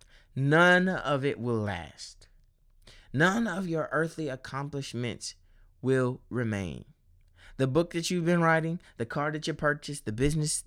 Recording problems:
none

